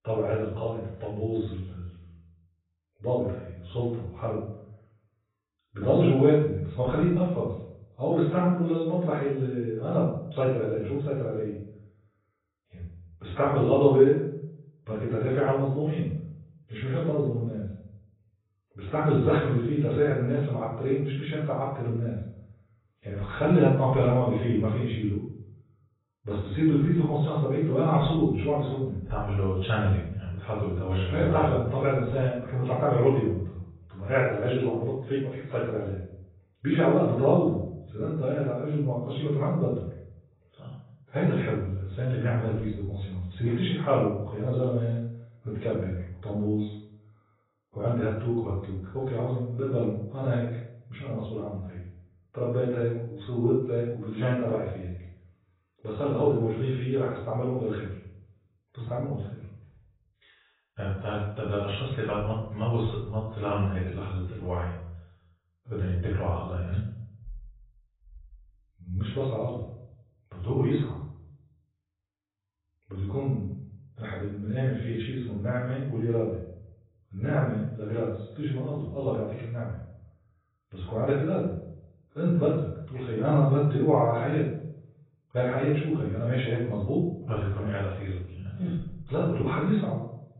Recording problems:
off-mic speech; far
garbled, watery; badly; nothing above 4 kHz
room echo; noticeable; dies away in 0.6 s

